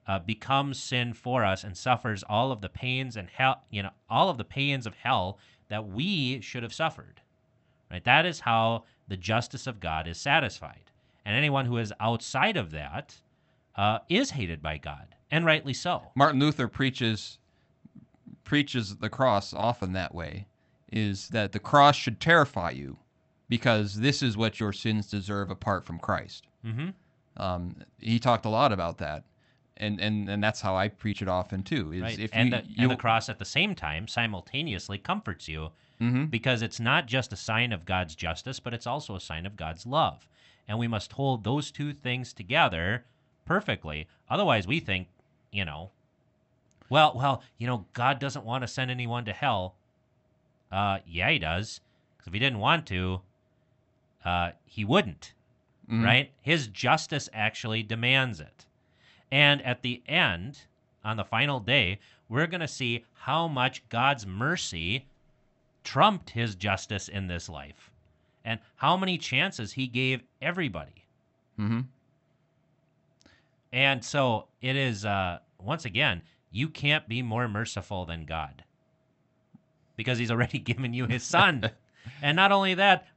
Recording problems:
high frequencies cut off; noticeable; nothing above 8 kHz

